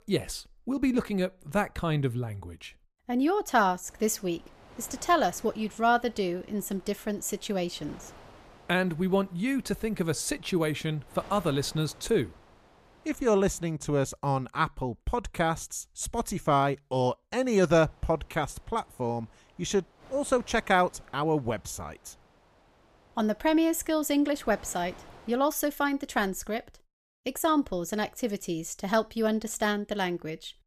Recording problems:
wind noise on the microphone; occasional gusts; from 4 to 14 s and from 17 to 25 s; 25 dB below the speech

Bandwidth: 14.5 kHz